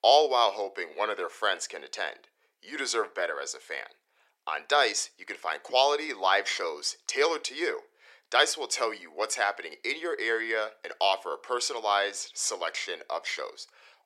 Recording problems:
thin; very; fading below 400 Hz

